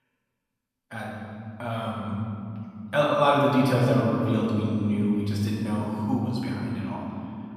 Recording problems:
room echo; strong; dies away in 3 s
off-mic speech; far

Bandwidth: 14 kHz